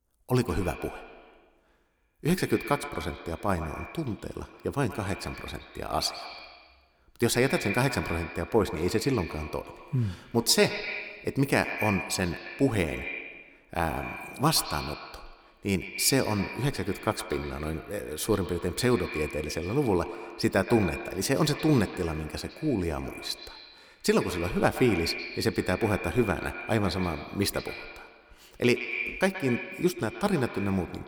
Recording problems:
echo of what is said; strong; throughout; 120 ms later, 9 dB below the speech

